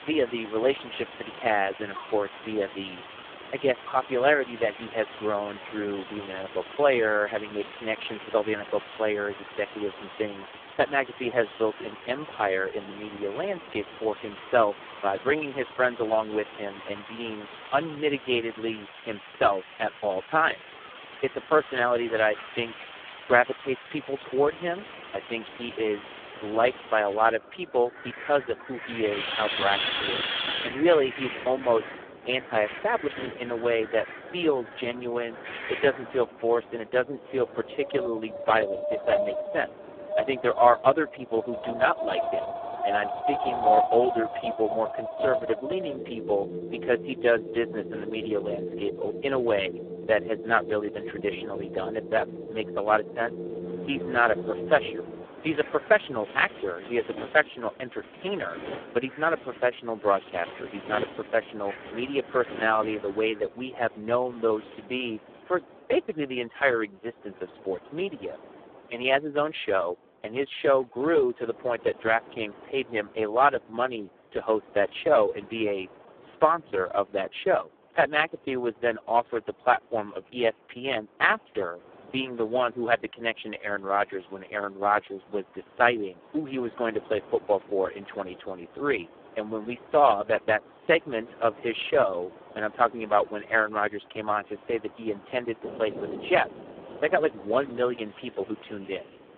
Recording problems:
phone-call audio; poor line
wind in the background; loud; throughout; 9 dB below the speech

